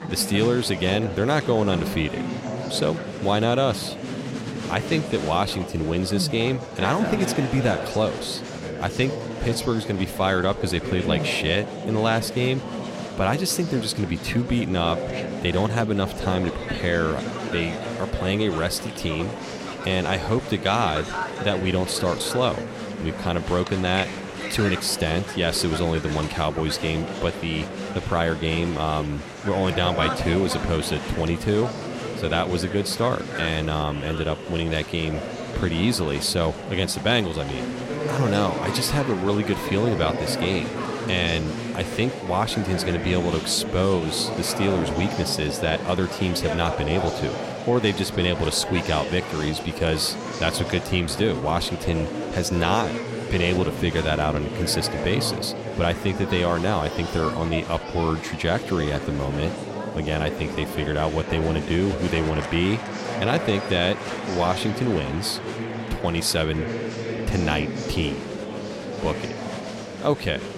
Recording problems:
murmuring crowd; loud; throughout; 6 dB below the speech

